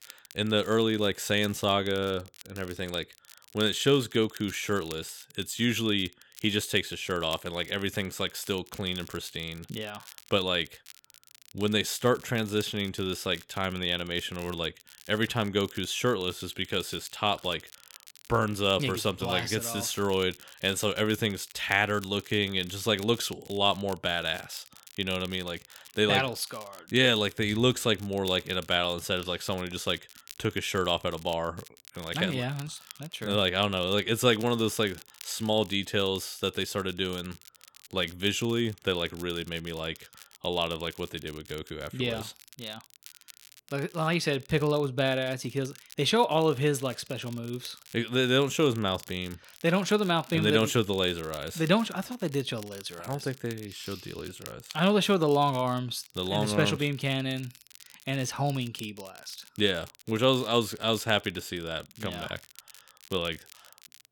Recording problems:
crackle, like an old record; faint; 20 dB below the speech

